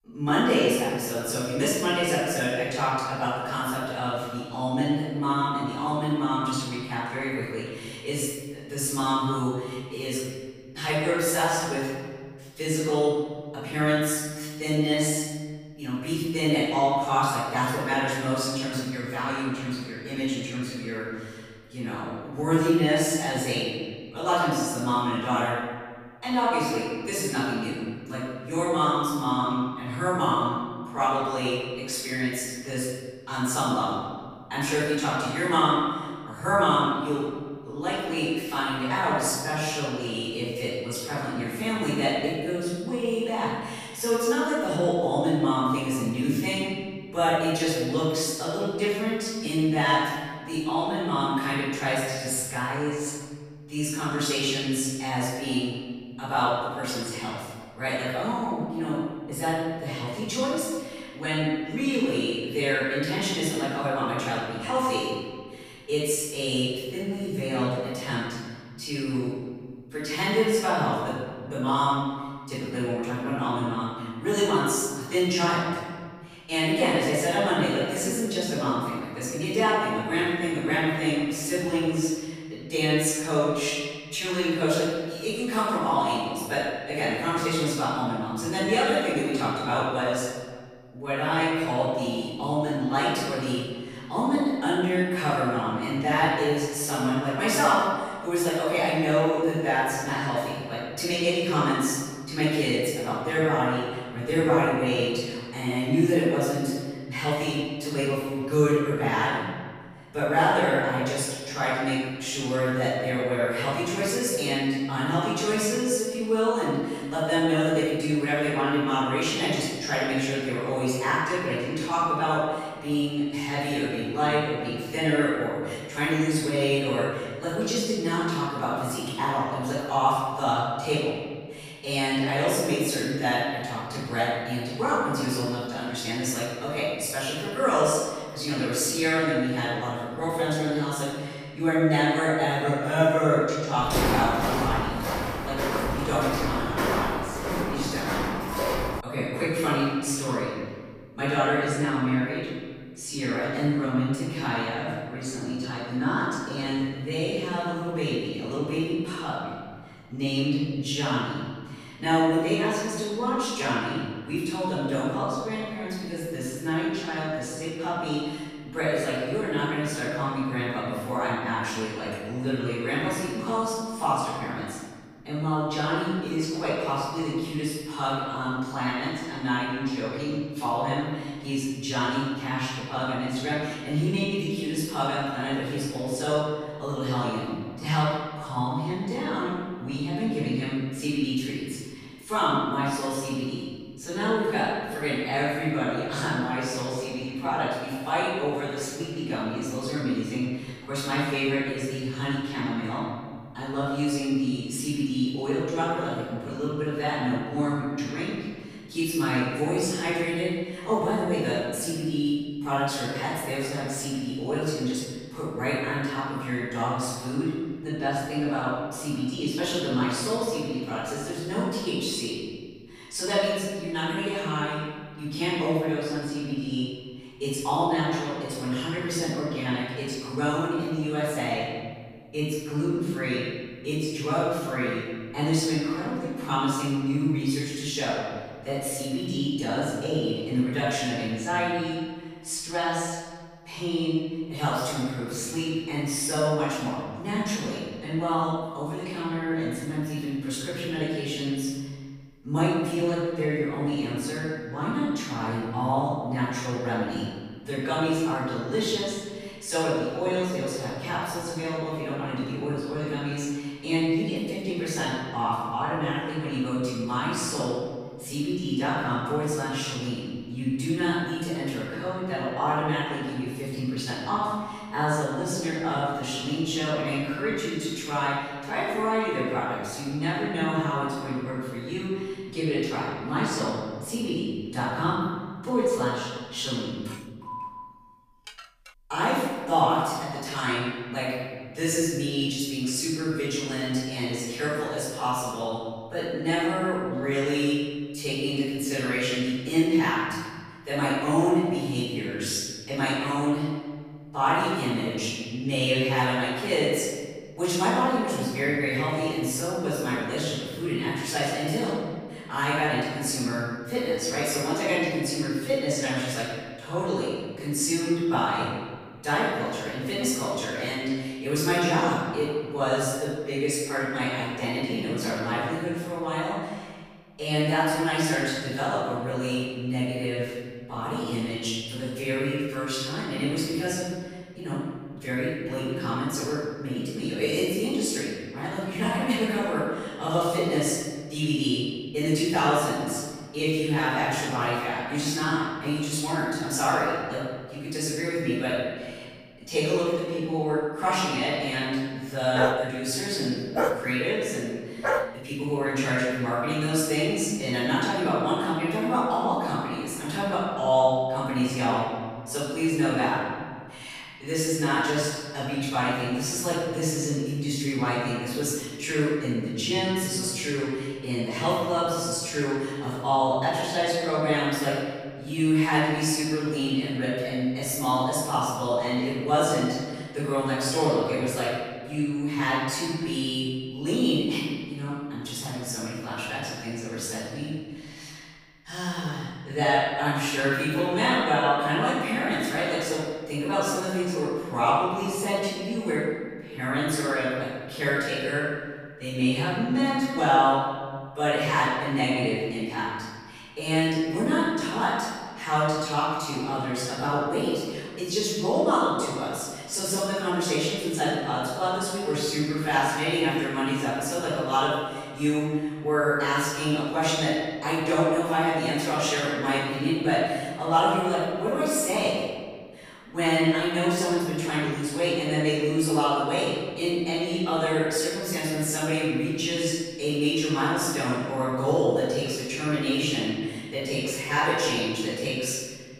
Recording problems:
room echo; strong; dies away in 1.5 s
off-mic speech; far
footsteps; loud; from 2:24 to 2:29; peak 3 dB above the speech
clattering dishes; faint; from 4:47 to 4:49; peak 20 dB below the speech
dog barking; loud; from 5:53 to 5:55; peak 1 dB above the speech

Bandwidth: 15 kHz